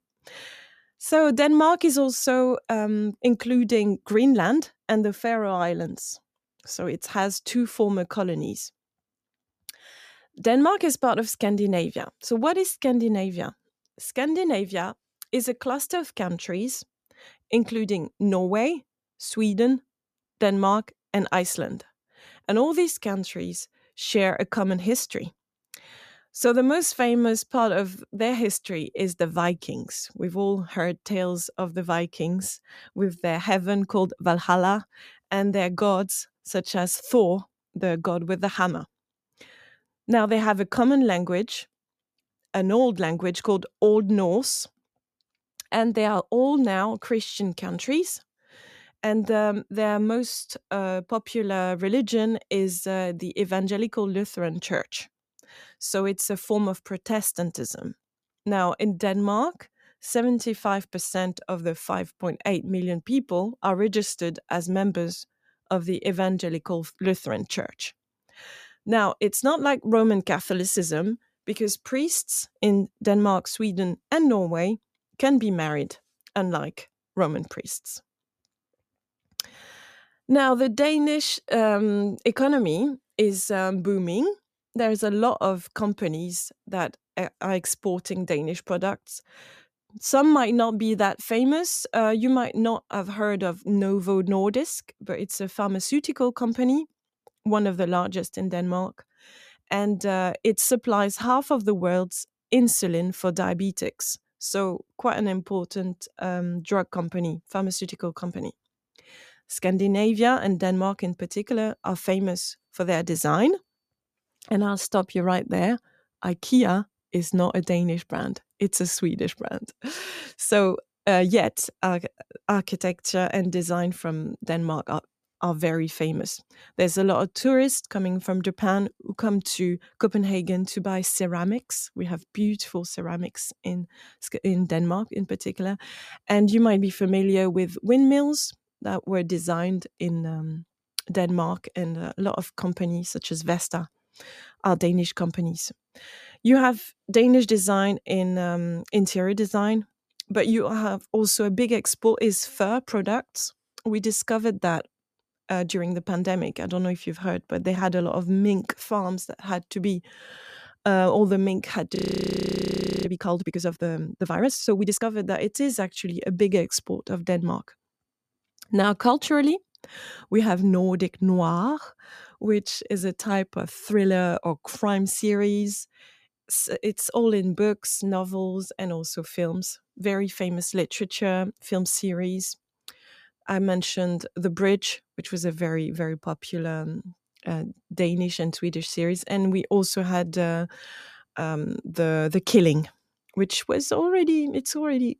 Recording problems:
audio freezing; at 2:42 for 1 s

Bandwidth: 14.5 kHz